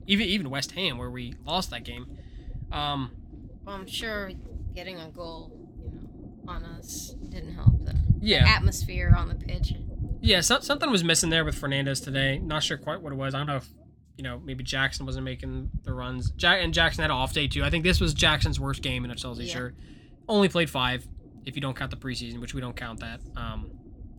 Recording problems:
low rumble; faint; throughout; 20 dB below the speech

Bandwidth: 18 kHz